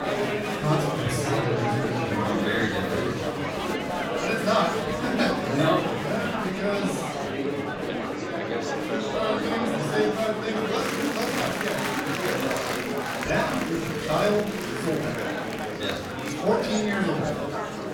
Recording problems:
off-mic speech; far
room echo; noticeable; dies away in 0.6 s
murmuring crowd; loud; throughout; as loud as the speech
background music; faint; throughout; 25 dB below the speech

